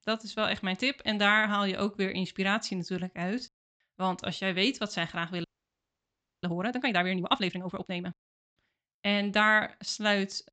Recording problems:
high frequencies cut off; noticeable; nothing above 8 kHz
audio freezing; at 5.5 s for 1 s

